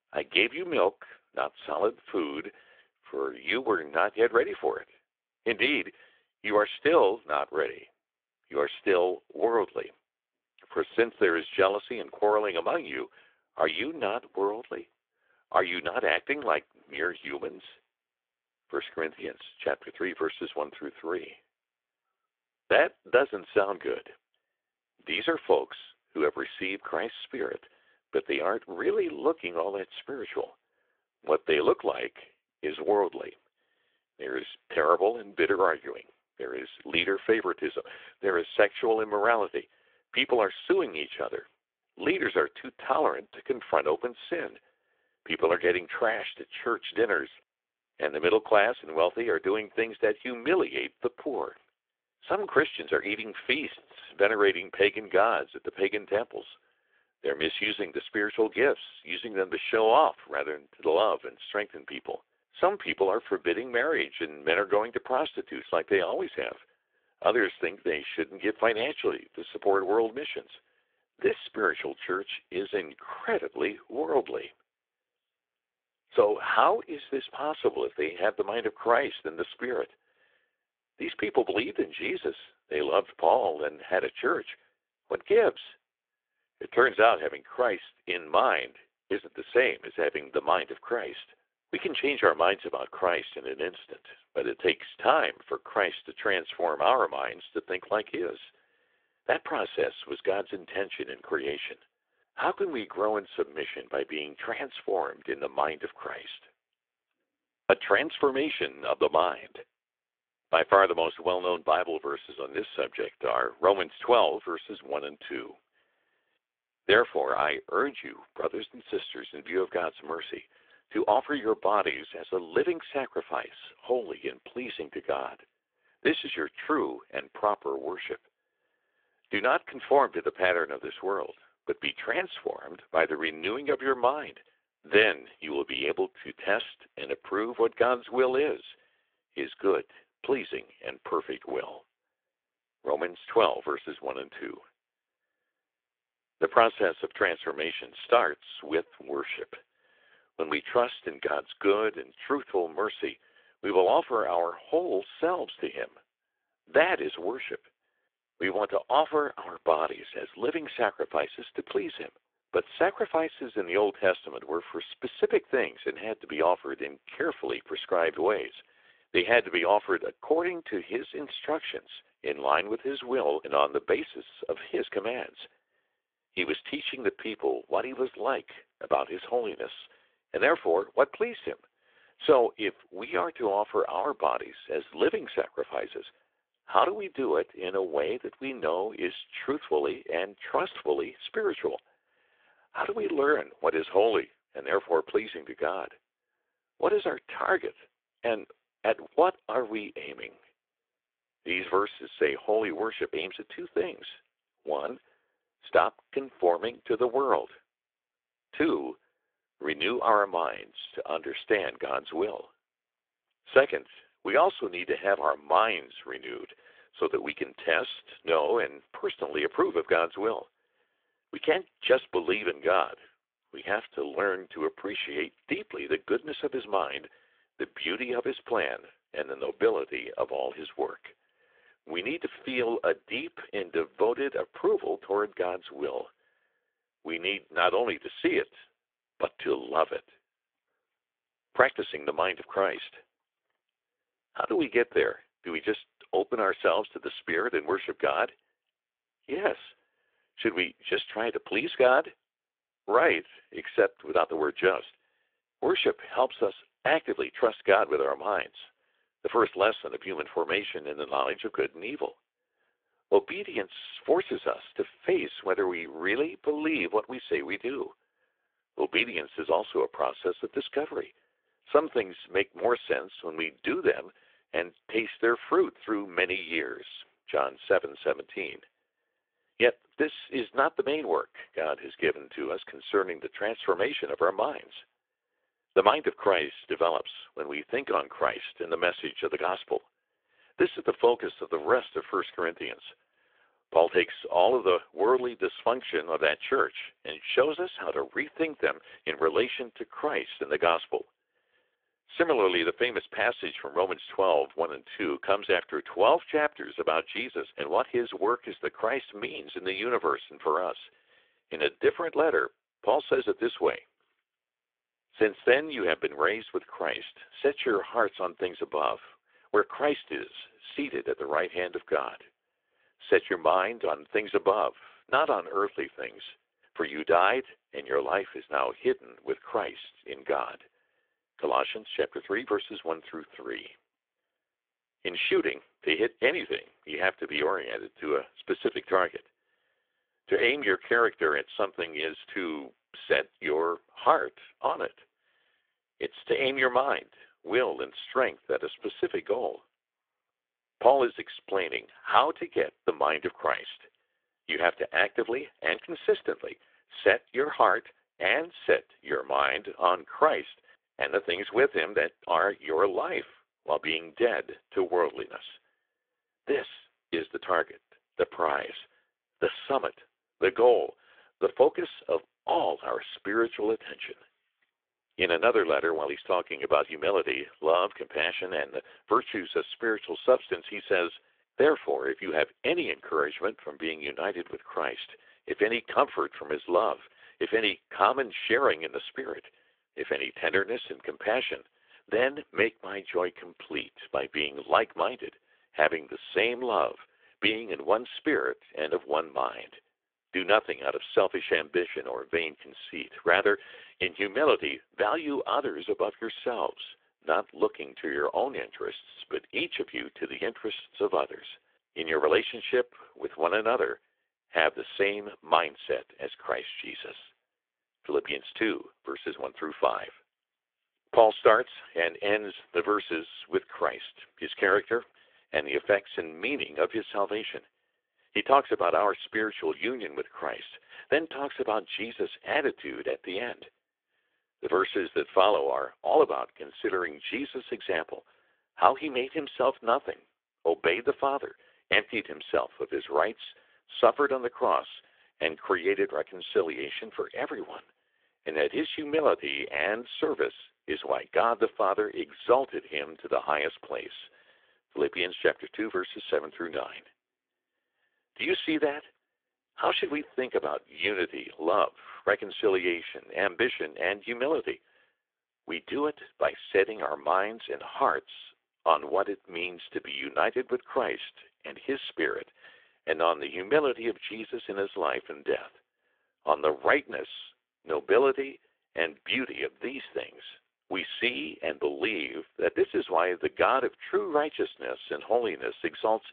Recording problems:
phone-call audio; nothing above 3.5 kHz

